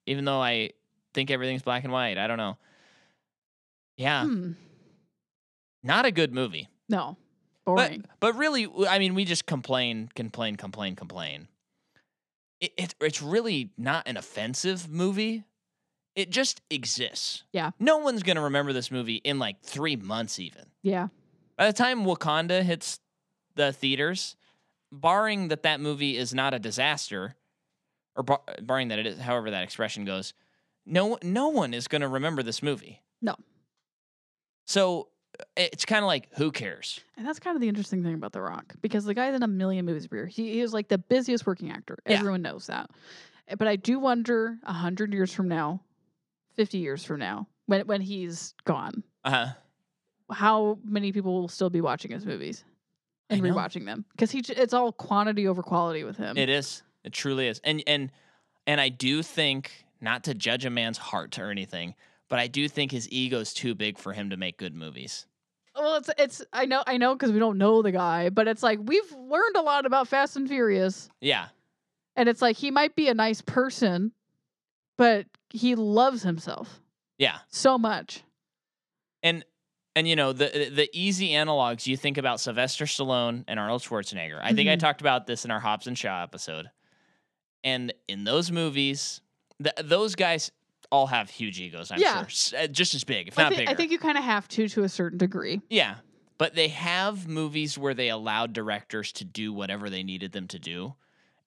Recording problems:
none

